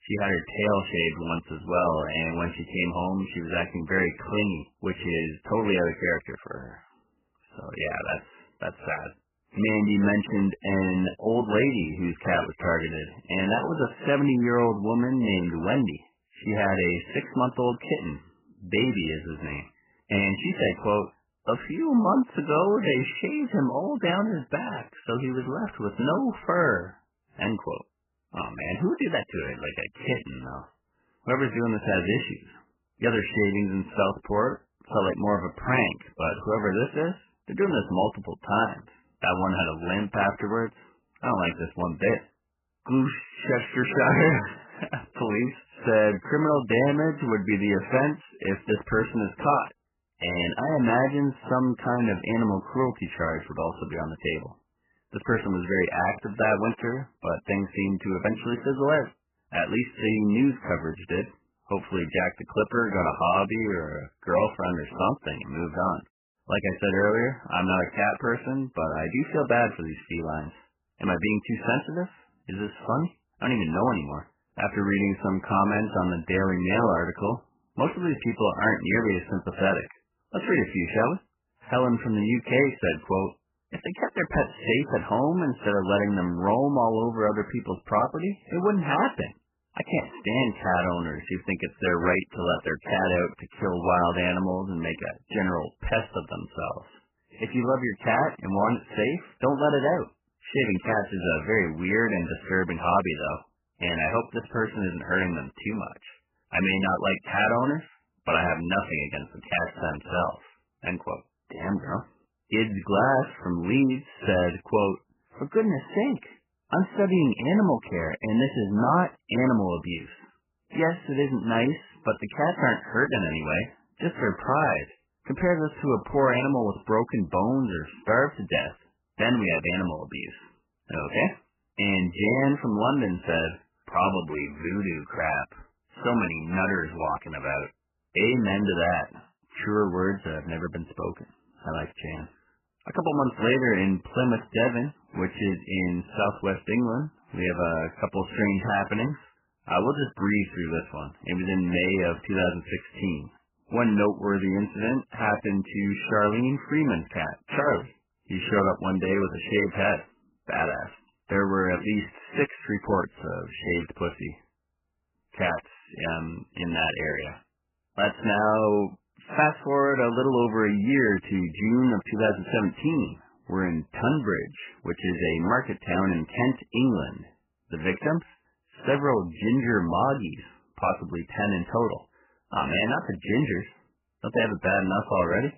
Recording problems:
garbled, watery; badly; nothing above 3 kHz

